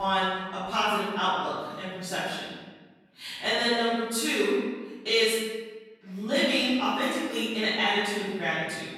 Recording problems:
room echo; strong; dies away in 1.2 s
off-mic speech; far
abrupt cut into speech; at the start

